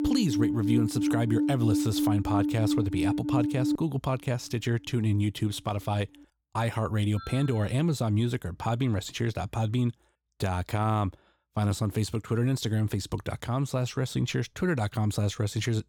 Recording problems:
alarms or sirens; very loud; until 7.5 s; 1 dB above the speech

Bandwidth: 17.5 kHz